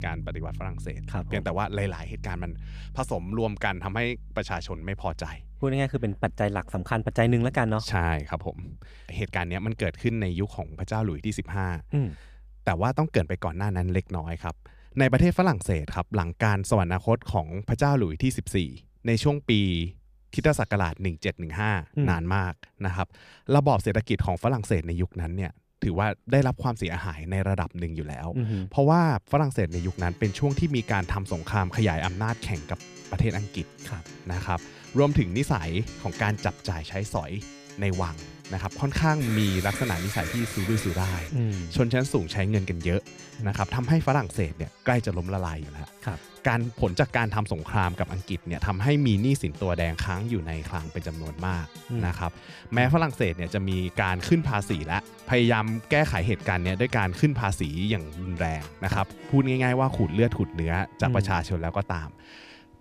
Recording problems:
background music; noticeable; throughout; 20 dB below the speech
alarm; noticeable; from 39 to 41 s; peak 6 dB below the speech

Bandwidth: 14.5 kHz